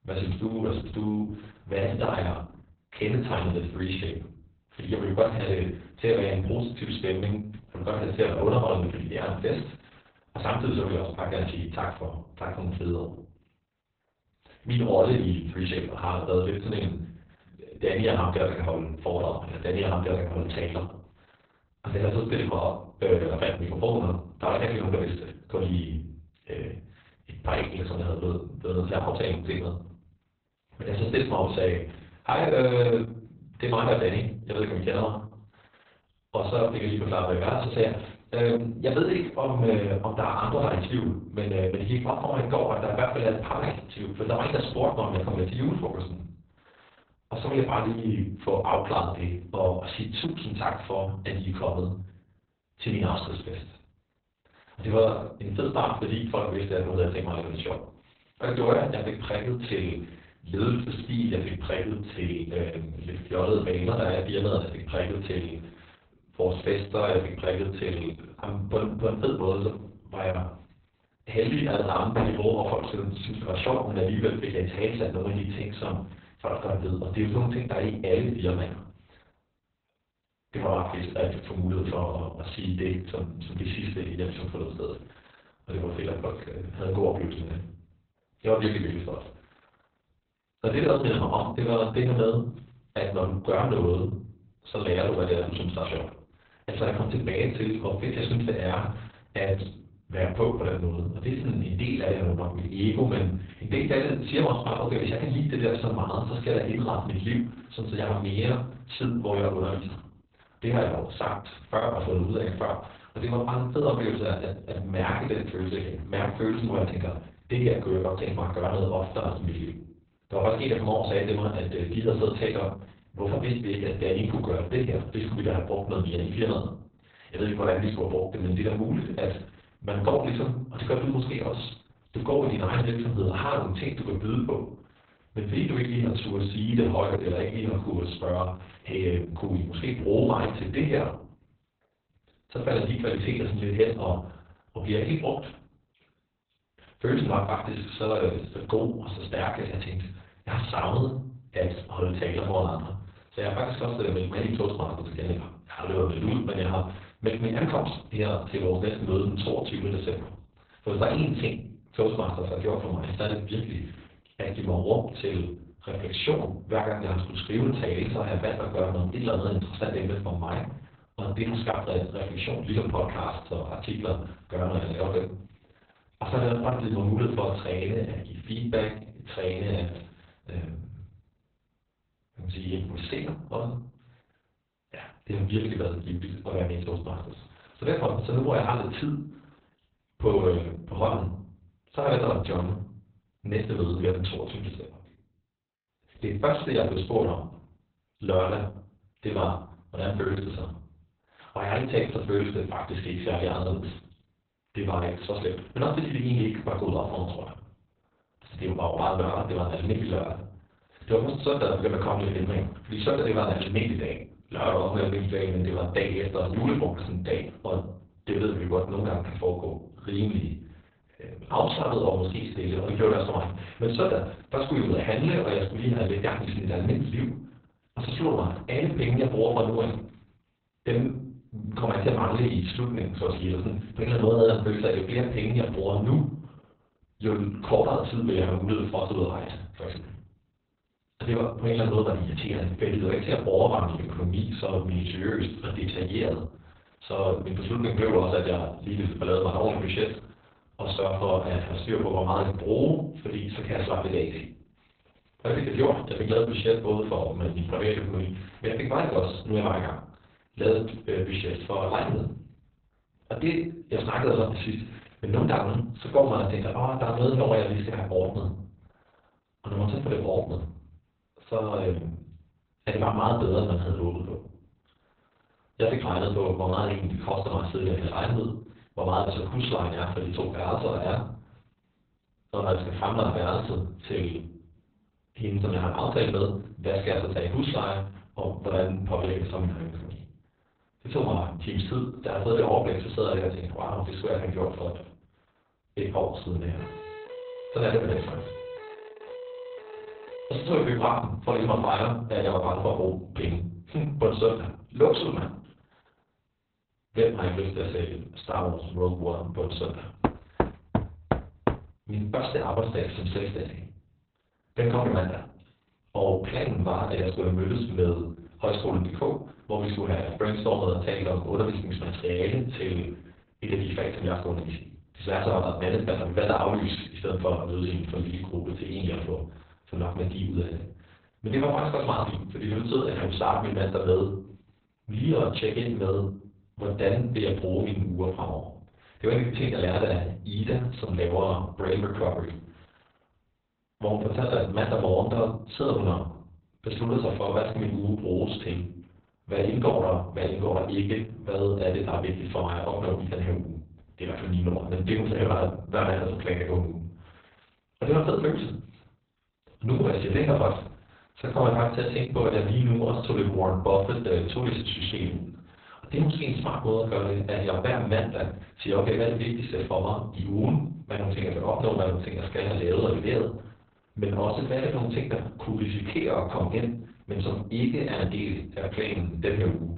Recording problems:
garbled, watery; badly; nothing above 4 kHz
room echo; slight; dies away in 0.4 s
off-mic speech; somewhat distant
door banging; noticeable; at 1:12; peak 3 dB below the speech
siren; faint; from 4:57 to 5:01; peak 10 dB below the speech
door banging; loud; from 5:10 to 5:12; peak 1 dB above the speech

